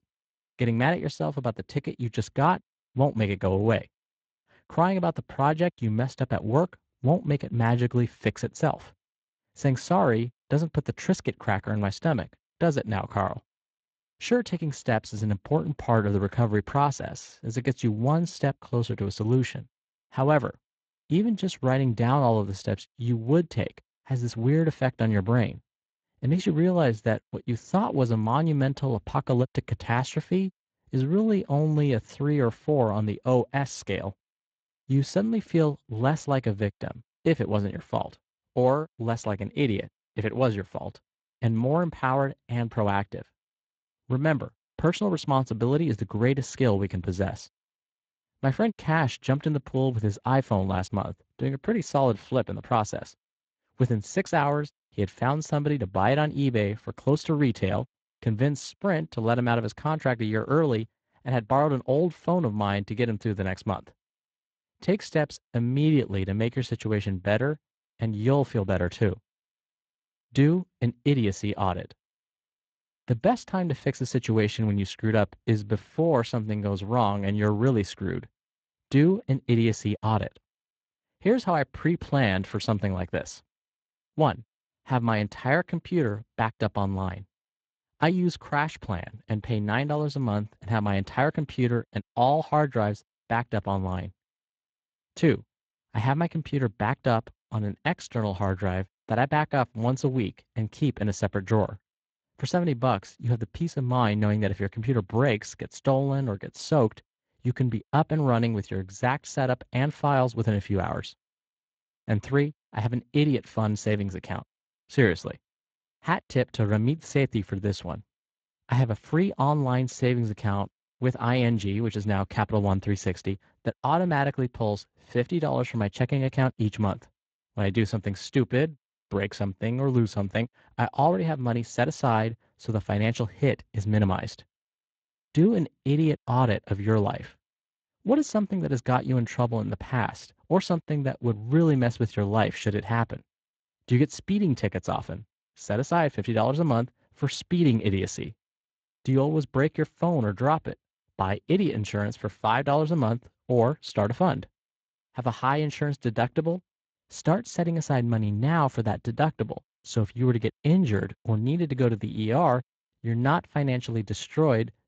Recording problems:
garbled, watery; slightly; nothing above 7.5 kHz

